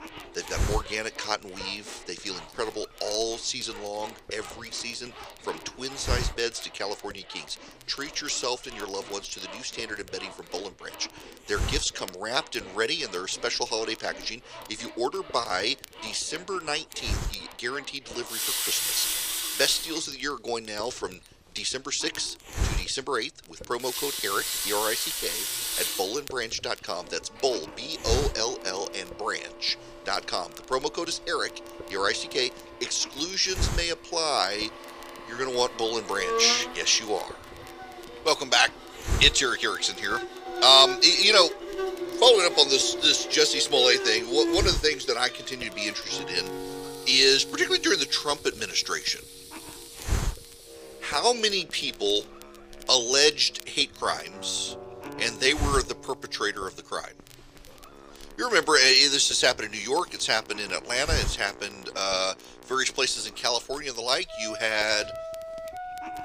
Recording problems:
thin; somewhat; fading below 450 Hz
household noises; noticeable; until 51 s; 10 dB below the speech
background music; noticeable; from 36 s on; 10 dB below the speech
hiss; noticeable; throughout; 15 dB below the speech
crackle, like an old record; faint; 30 dB below the speech

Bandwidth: 15 kHz